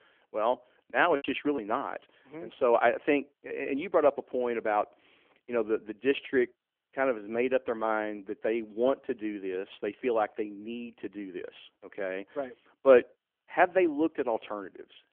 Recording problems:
phone-call audio; nothing above 3 kHz
choppy; very; at 1 s; 12% of the speech affected

